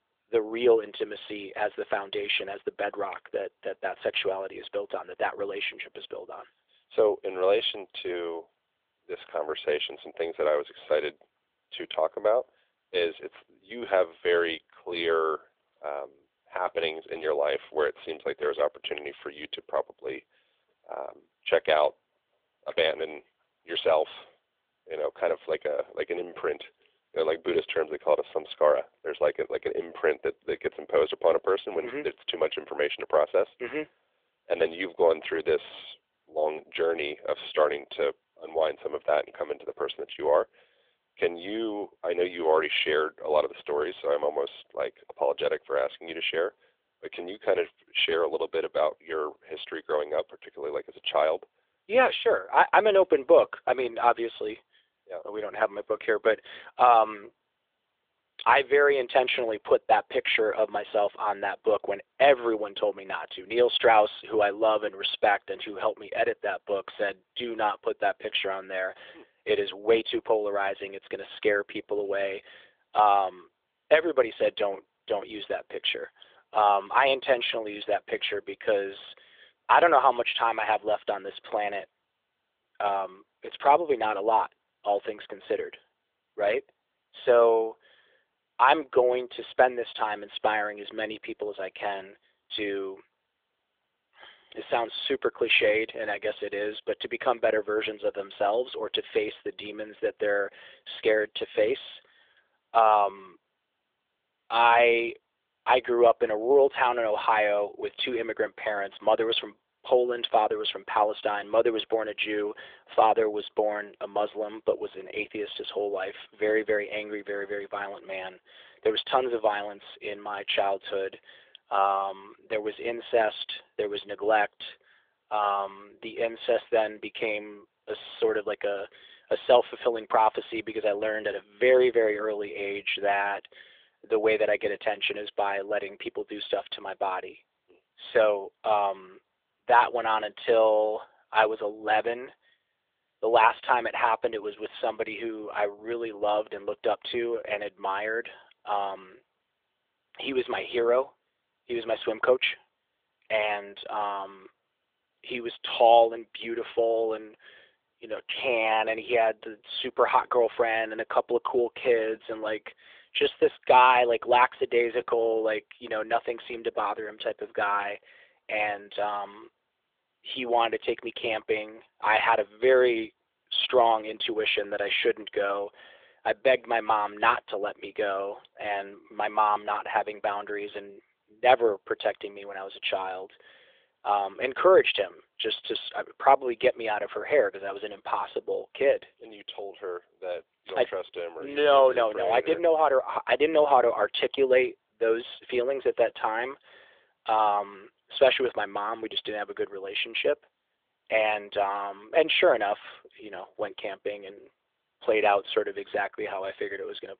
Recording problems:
phone-call audio; nothing above 3.5 kHz

